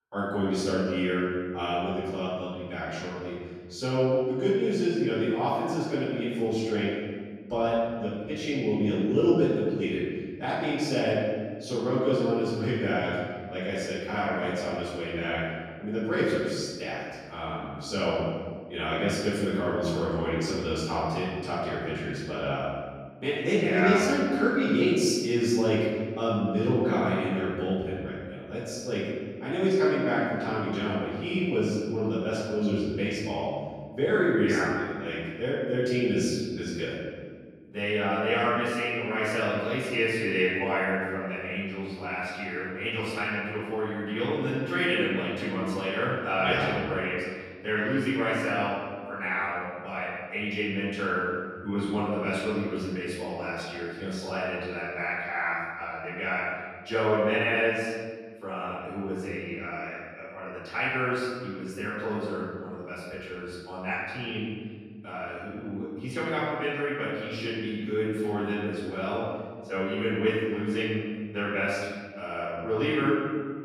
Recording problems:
room echo; strong; dies away in 1.6 s
off-mic speech; far

